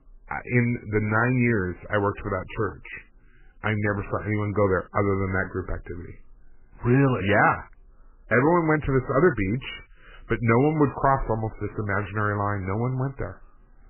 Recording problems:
garbled, watery; badly; nothing above 3 kHz

